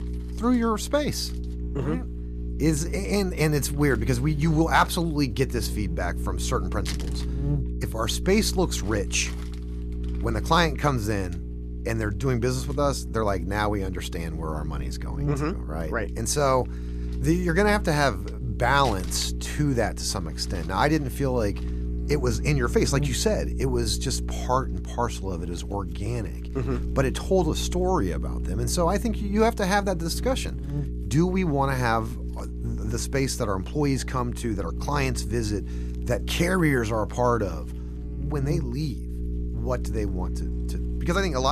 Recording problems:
electrical hum; noticeable; throughout; 60 Hz, 15 dB below the speech
household noises; faint; throughout; 25 dB below the speech
abrupt cut into speech; at the end

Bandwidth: 14.5 kHz